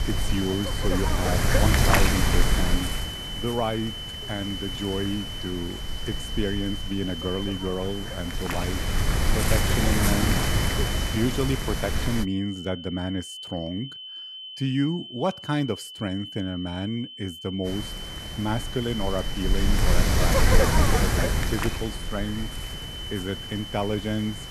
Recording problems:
wind noise on the microphone; heavy; until 12 s and from 18 s on; 5 dB above the speech
high-pitched whine; loud; throughout; 3 kHz, 6 dB below the speech

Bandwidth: 13.5 kHz